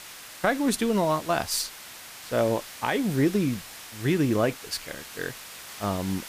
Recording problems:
hiss; noticeable; throughout; 15 dB below the speech

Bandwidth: 15 kHz